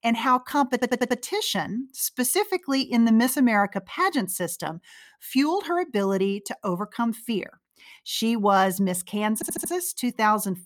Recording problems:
audio stuttering; at 0.5 s and at 9.5 s

